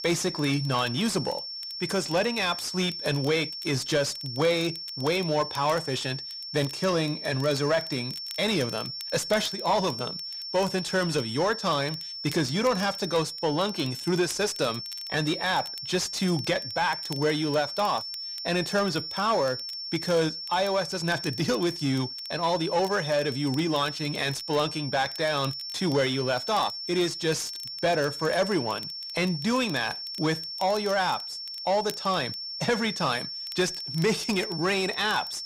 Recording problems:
distortion; slight; 10 dB below the speech
high-pitched whine; loud; throughout; 5.5 kHz, 7 dB below the speech
crackle, like an old record; faint; 25 dB below the speech

